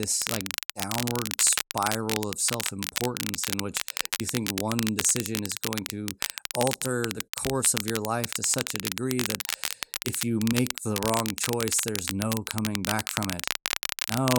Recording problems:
crackle, like an old record; loud; 2 dB below the speech
abrupt cut into speech; at the start and the end

